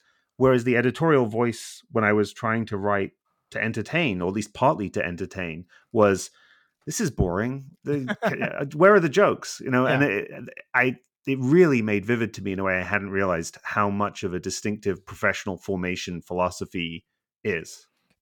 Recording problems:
none

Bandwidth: 18 kHz